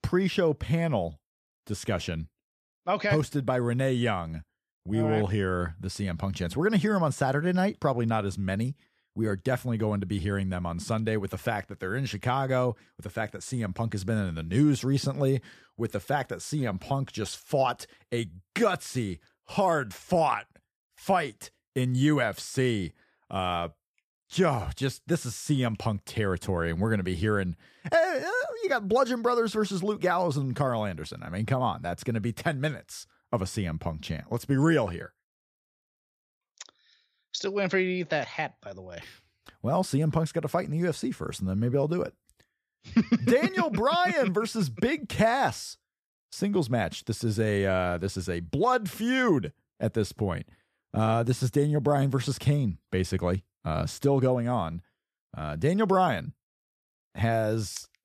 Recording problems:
none

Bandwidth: 14.5 kHz